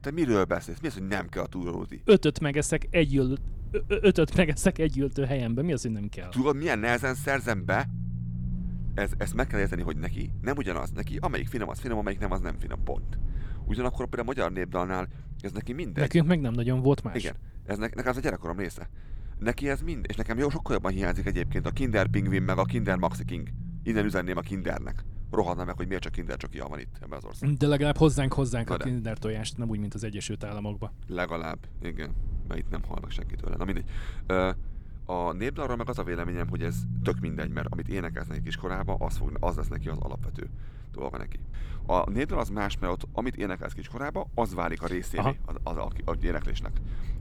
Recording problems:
low rumble; faint; throughout; 20 dB below the speech

